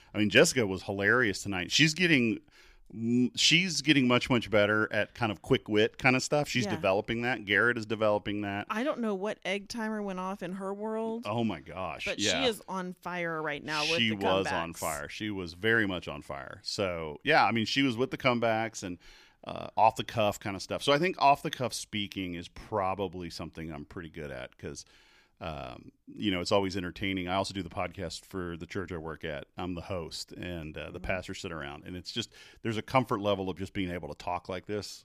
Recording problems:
none

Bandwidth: 15 kHz